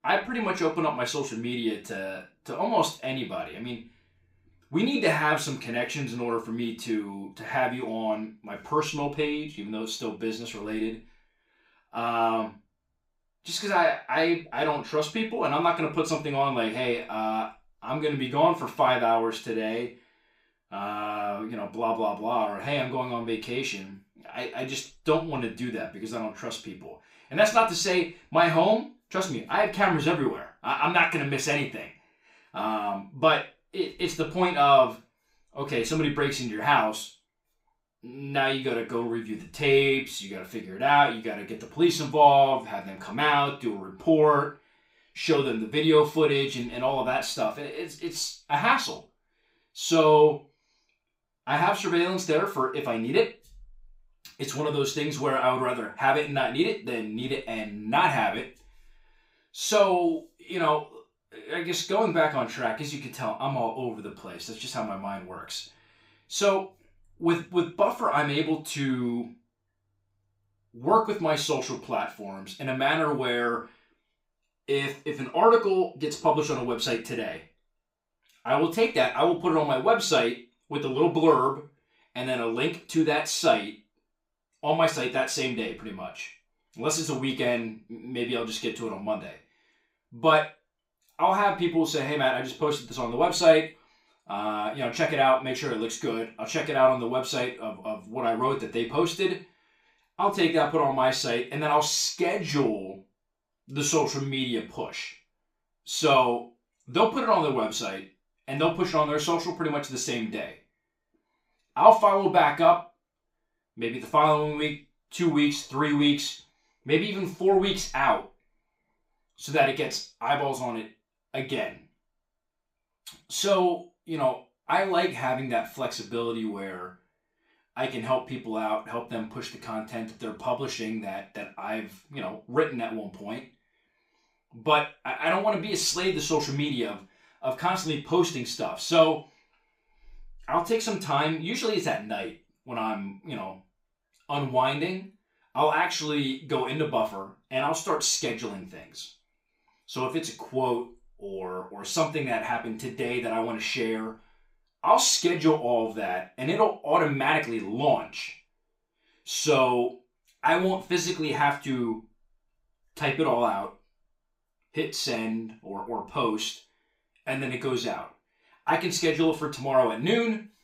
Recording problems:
off-mic speech; far
room echo; slight; dies away in 0.3 s

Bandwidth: 15.5 kHz